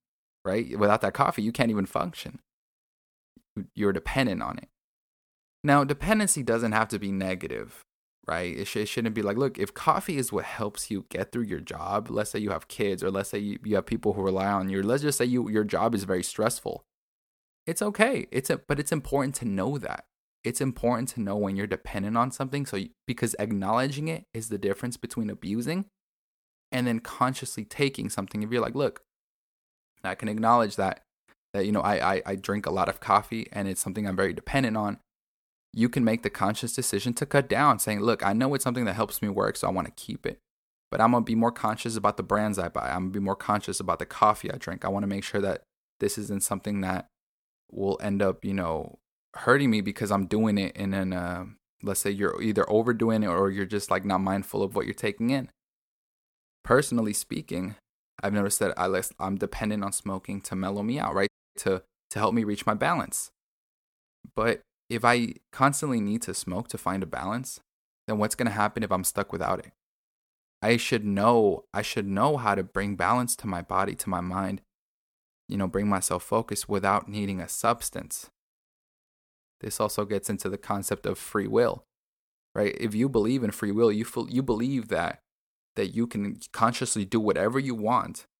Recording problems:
audio cutting out; at 1:01

